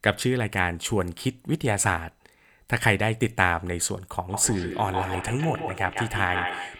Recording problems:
echo of what is said; strong; from 4.5 s on; 150 ms later, 7 dB below the speech

